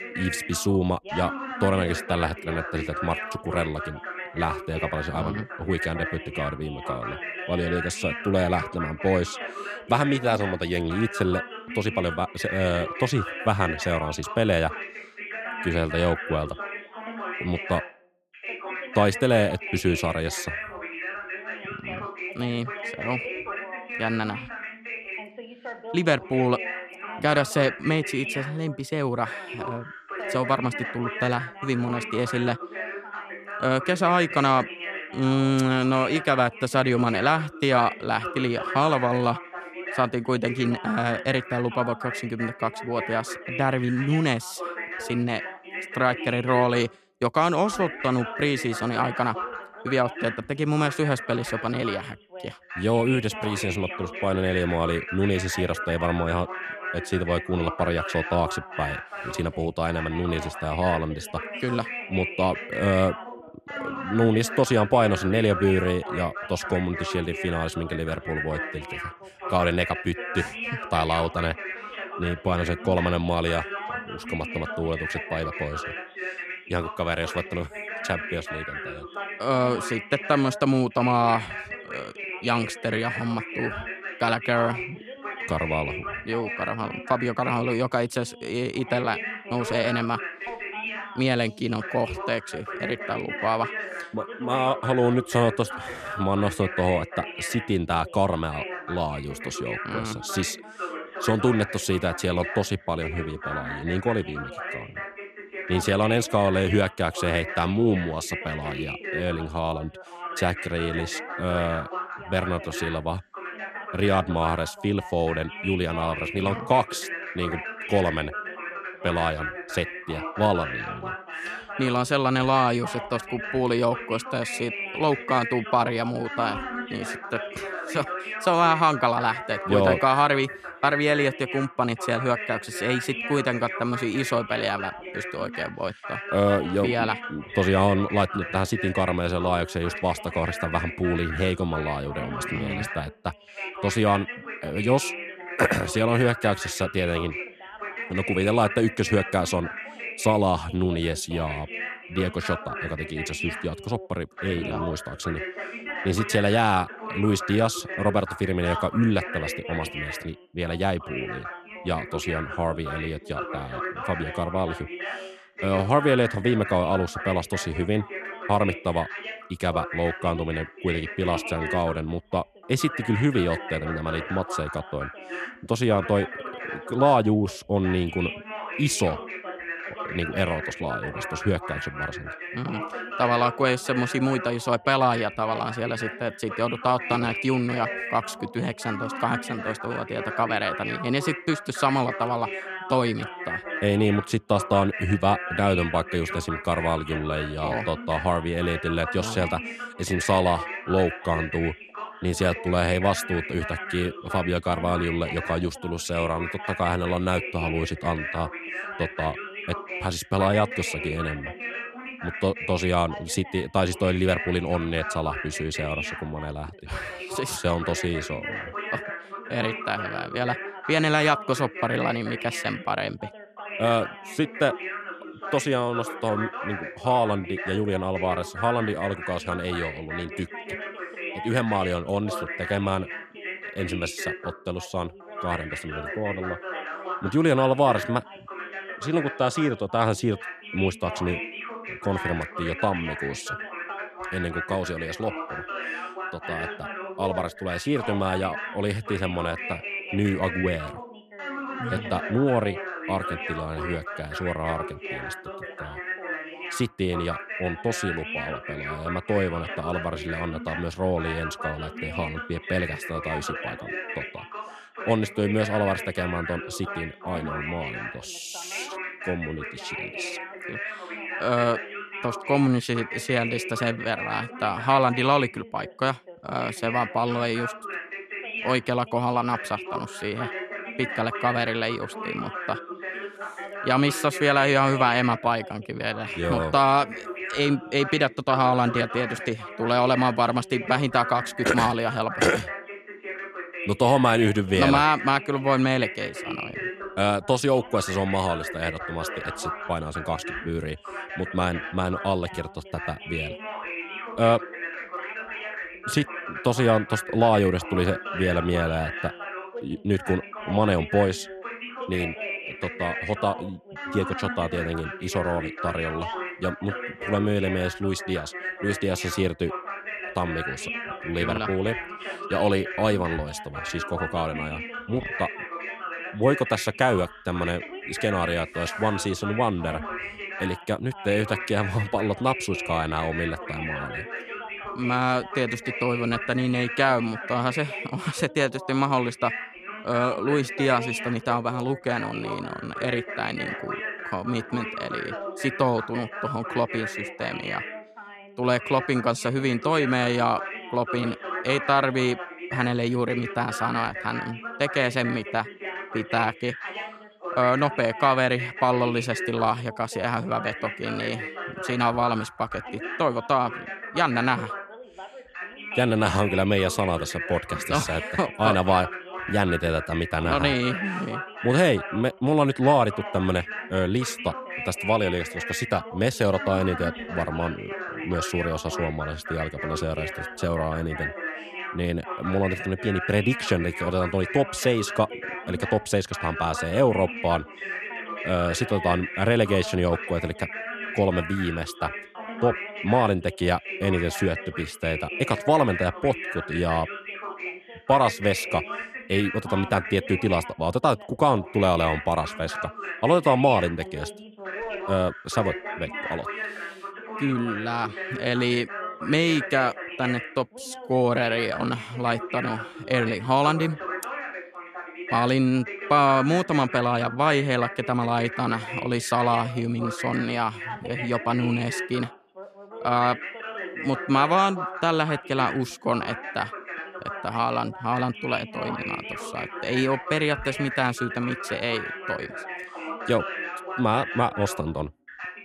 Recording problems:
background chatter; loud; throughout; 2 voices, 8 dB below the speech

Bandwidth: 14 kHz